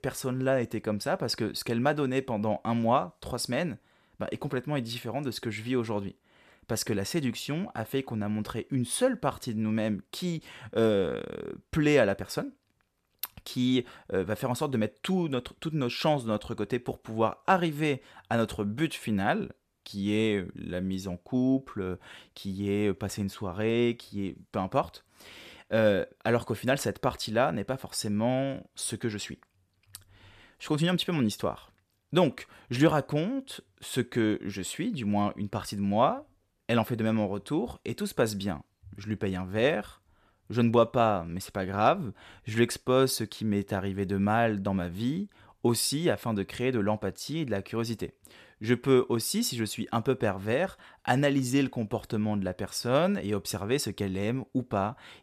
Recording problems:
none

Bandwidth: 14 kHz